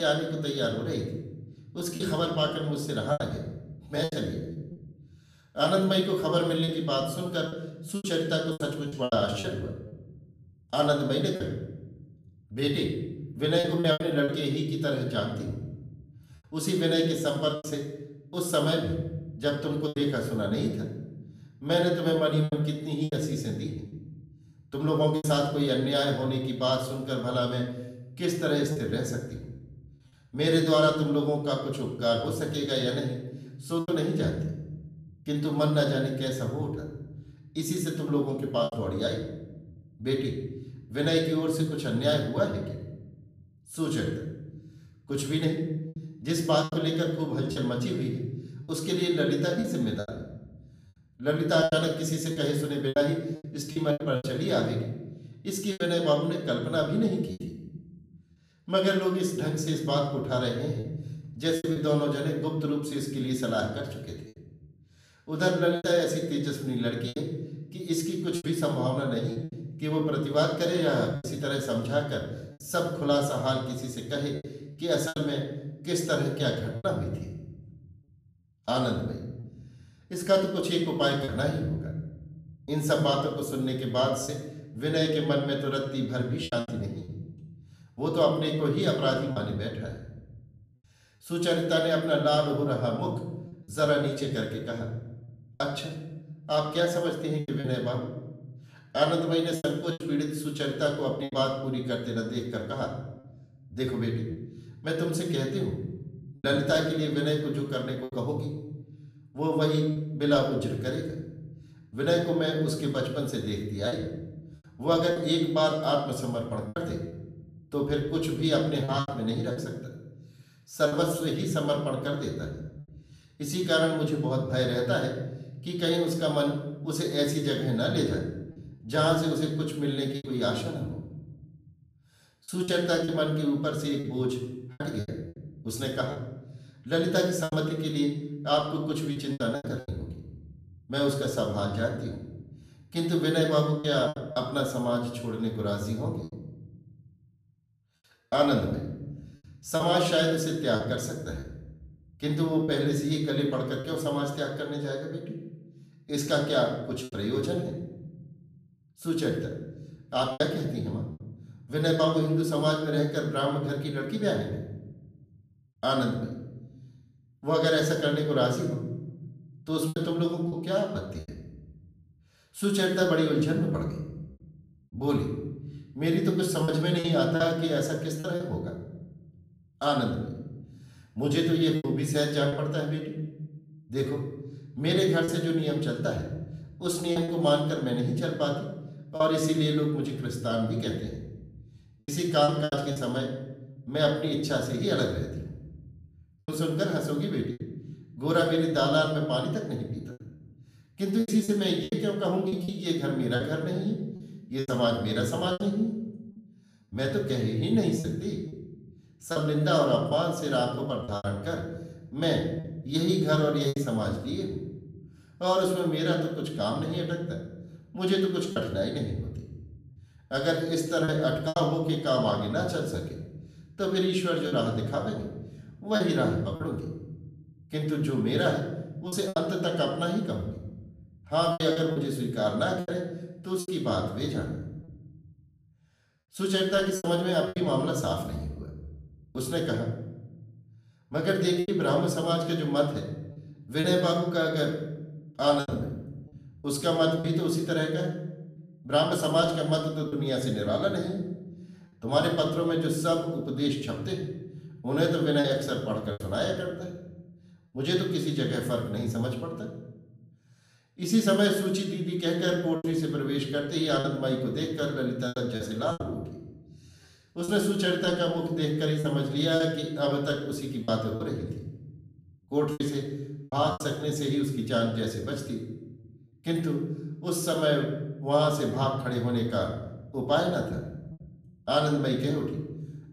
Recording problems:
off-mic speech; far
room echo; noticeable; dies away in 1 s
choppy; occasionally; 5% of the speech affected
abrupt cut into speech; at the start

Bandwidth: 14.5 kHz